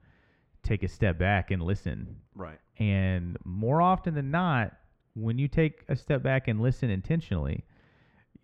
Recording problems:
muffled; very; fading above 3 kHz

